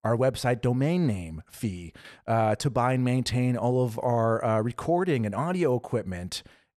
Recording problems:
none

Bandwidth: 13.5 kHz